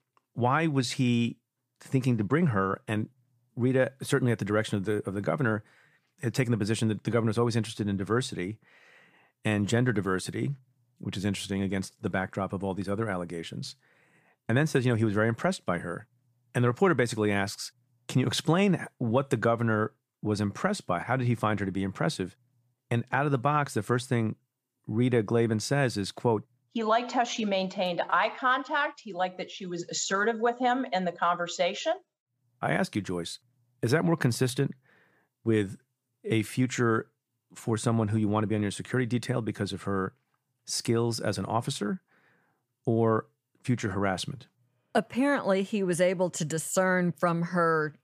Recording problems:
none

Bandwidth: 15 kHz